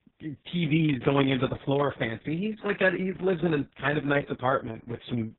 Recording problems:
garbled, watery; badly
high frequencies cut off; severe; nothing above 3.5 kHz

